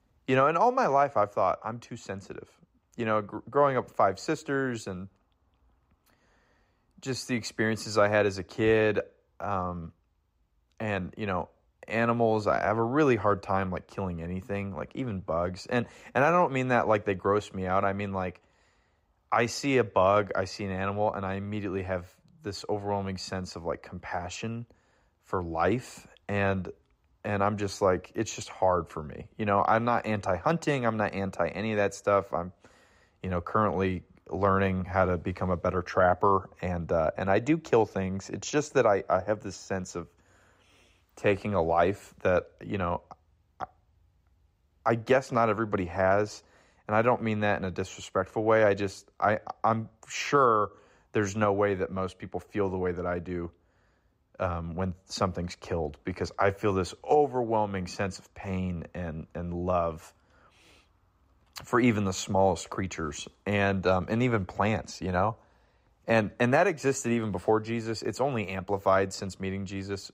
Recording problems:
none

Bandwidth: 15.5 kHz